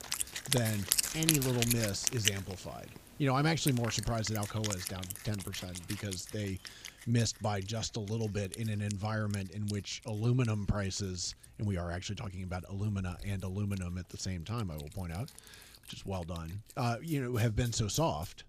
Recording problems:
background music; loud; throughout; 1 dB below the speech

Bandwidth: 15 kHz